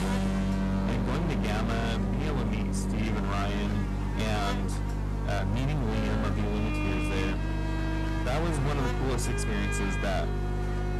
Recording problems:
distortion; heavy; 33% of the sound clipped
electrical hum; loud; throughout; 50 Hz, 6 dB below the speech
background music; loud; throughout; 2 dB below the speech

